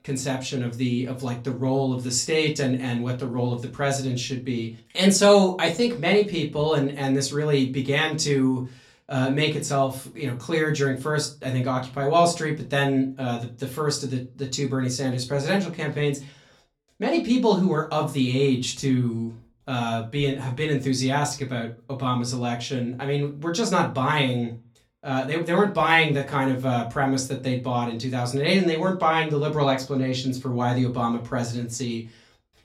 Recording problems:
off-mic speech; far
room echo; very slight; dies away in 0.2 s

